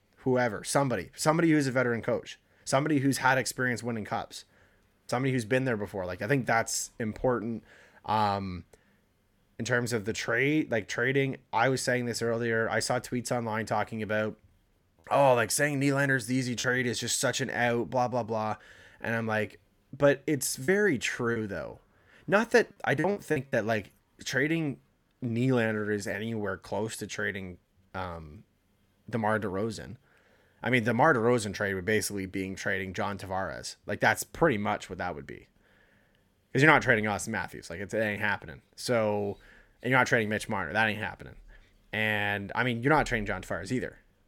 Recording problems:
choppy; very; from 15 to 17 s and from 21 to 24 s; 6% of the speech affected

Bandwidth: 17 kHz